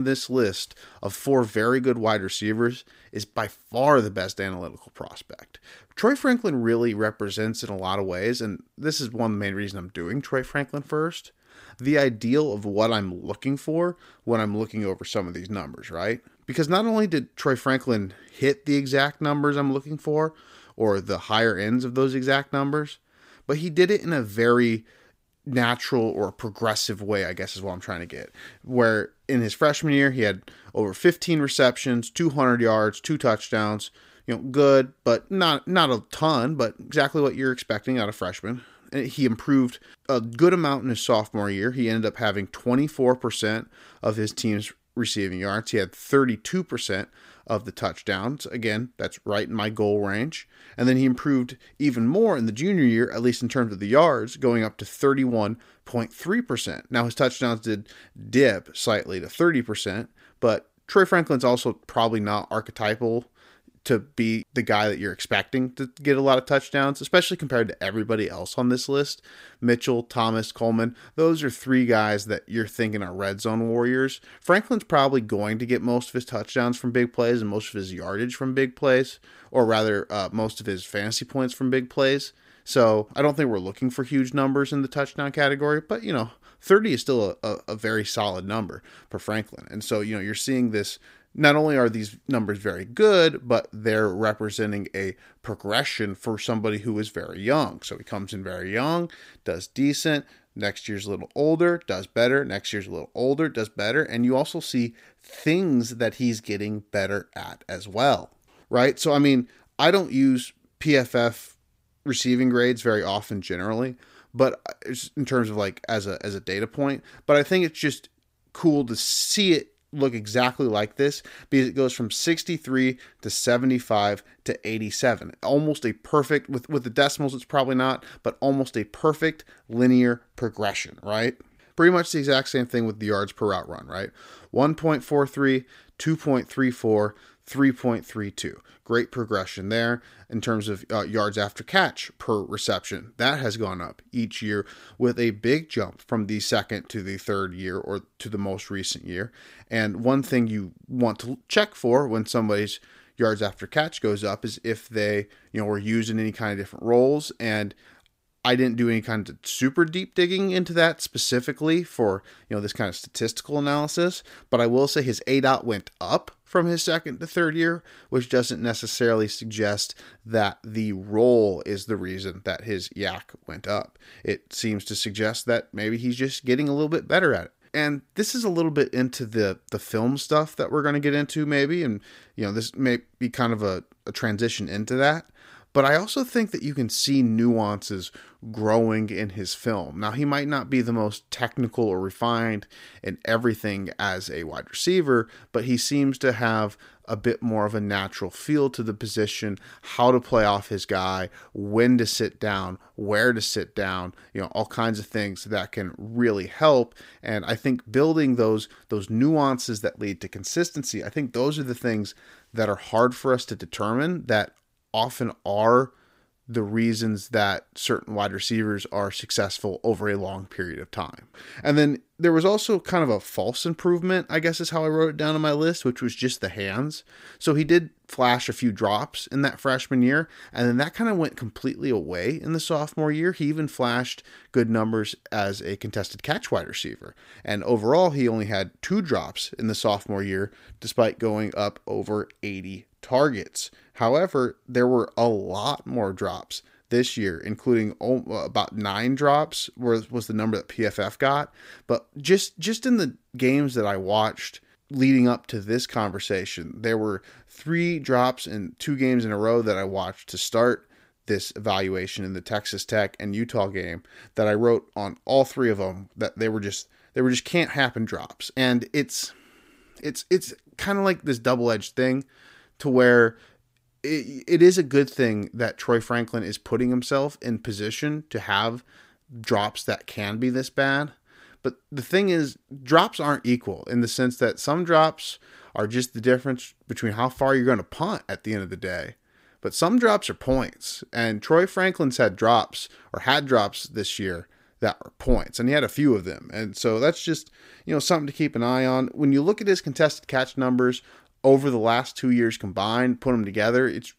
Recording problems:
abrupt cut into speech; at the start

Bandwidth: 15.5 kHz